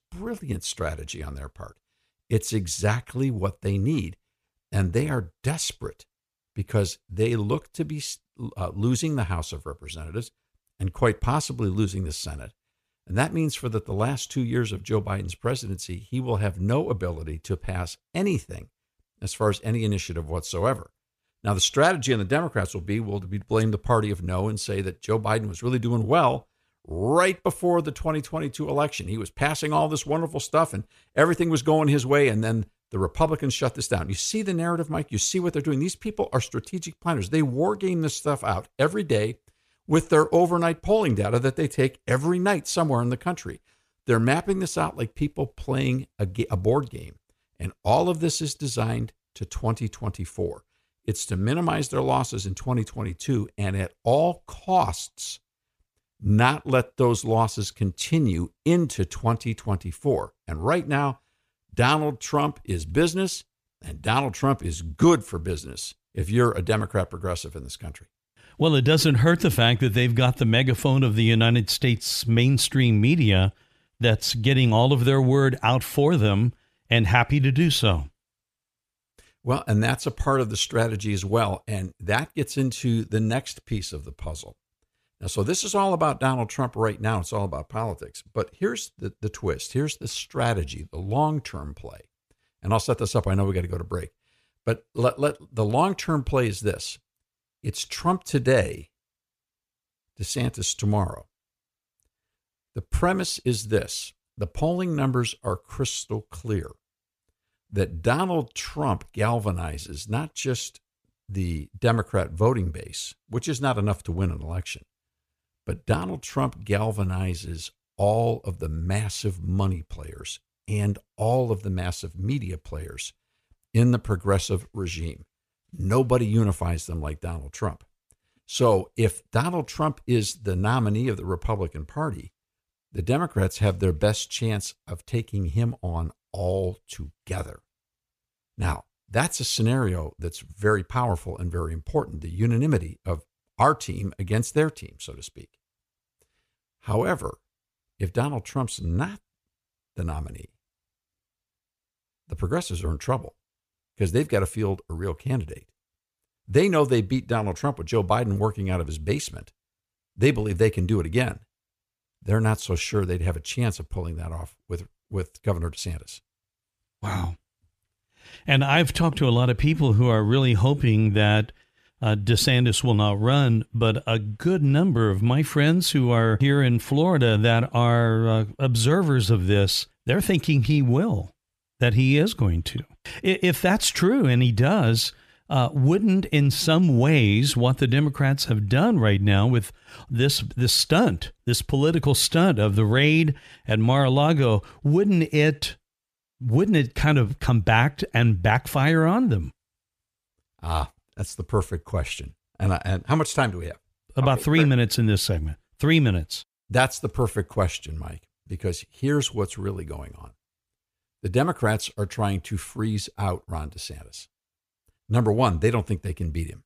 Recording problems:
none

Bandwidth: 14.5 kHz